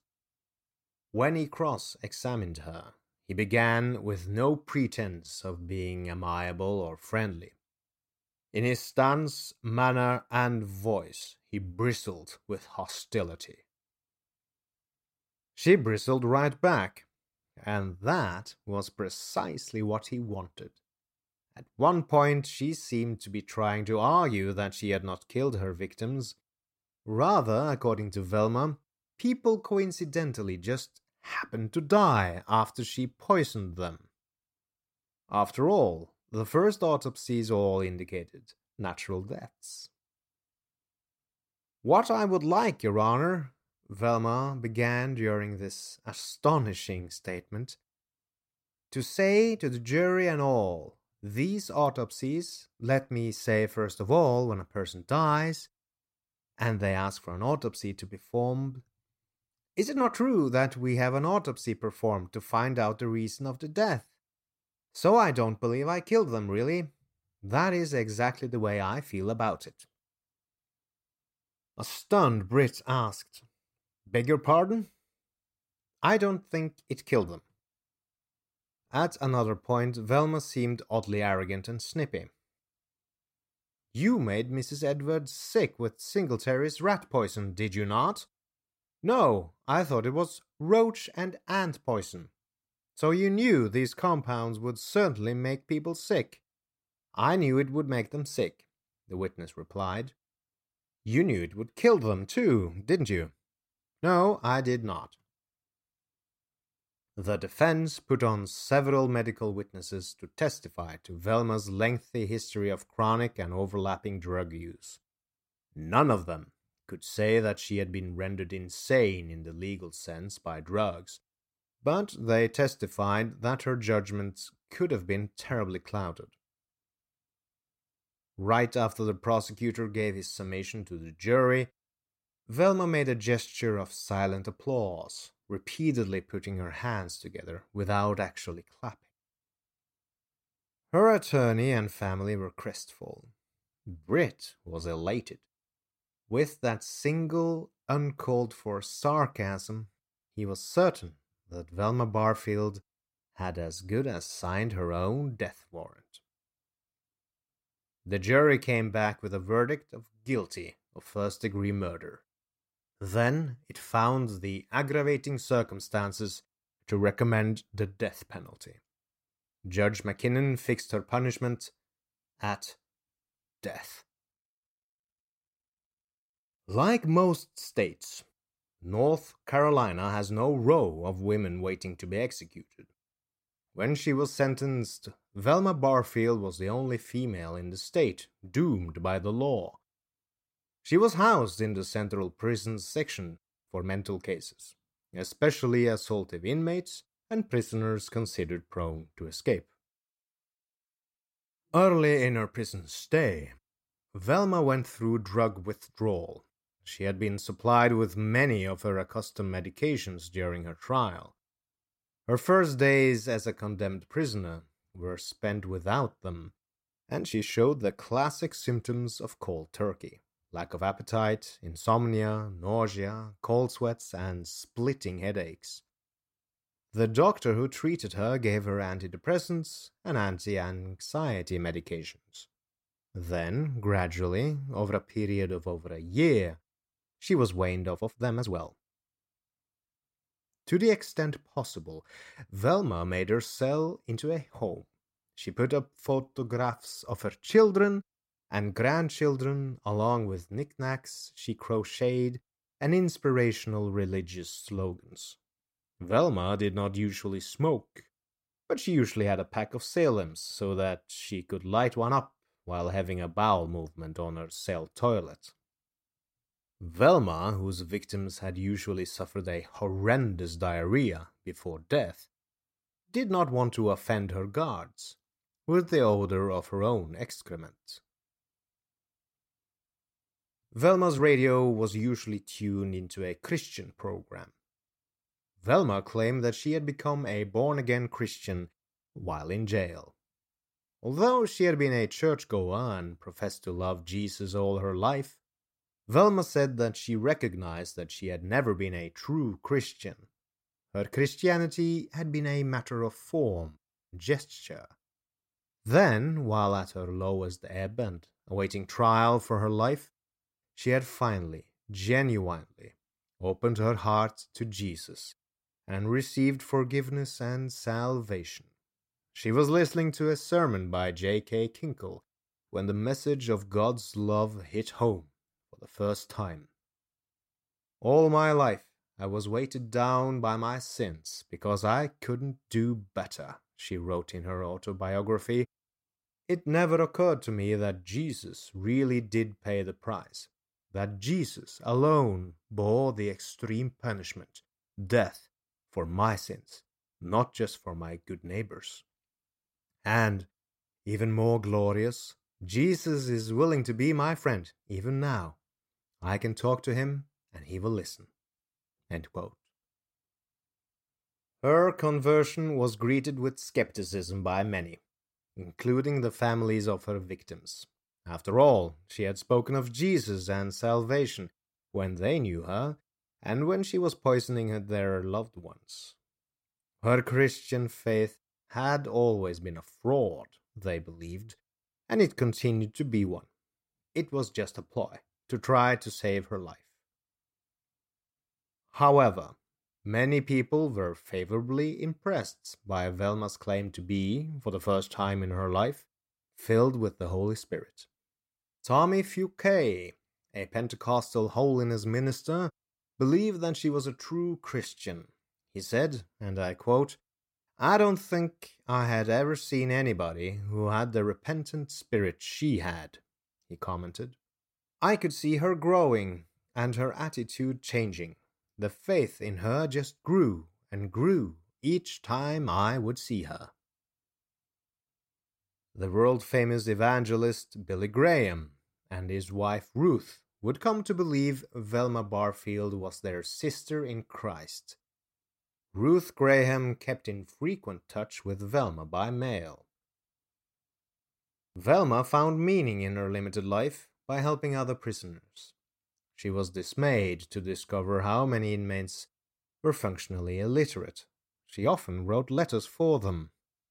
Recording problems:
uneven, jittery; strongly; from 5 s to 7:33

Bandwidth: 16 kHz